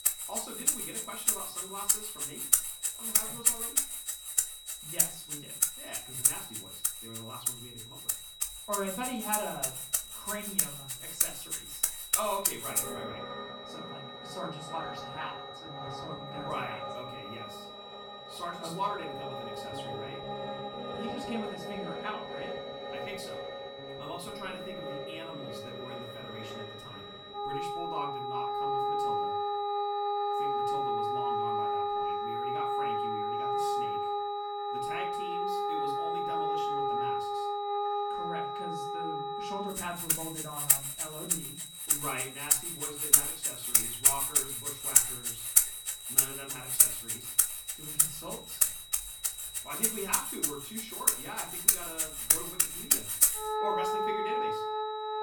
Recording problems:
off-mic speech; far
room echo; slight; dies away in 0.4 s
background music; very loud; throughout; 10 dB above the speech
high-pitched whine; loud; throughout; 4 kHz, 5 dB below the speech

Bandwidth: 18 kHz